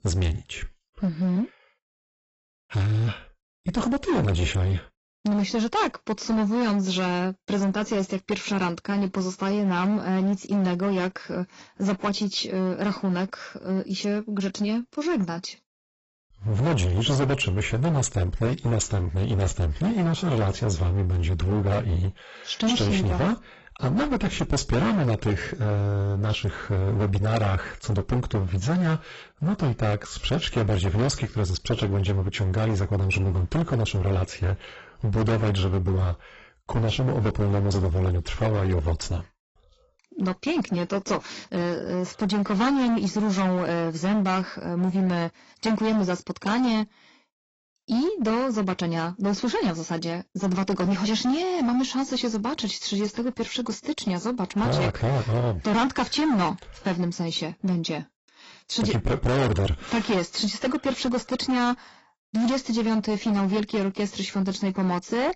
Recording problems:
distortion; heavy; 20% of the sound clipped
garbled, watery; badly; nothing above 8 kHz

